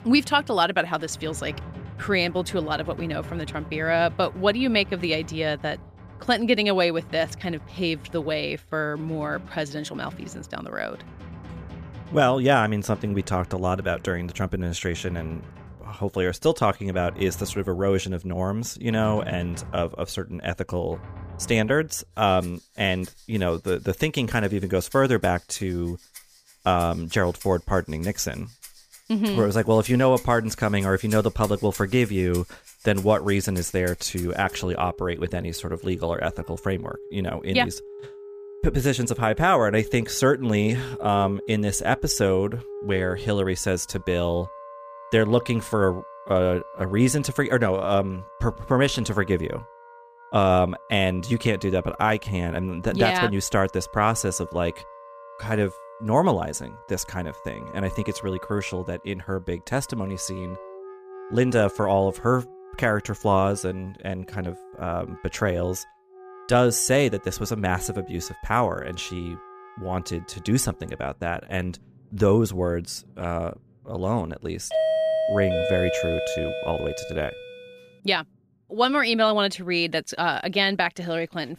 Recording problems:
background music; noticeable; throughout; 15 dB below the speech
doorbell; loud; from 1:15 to 1:17; peak 3 dB above the speech

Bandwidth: 15 kHz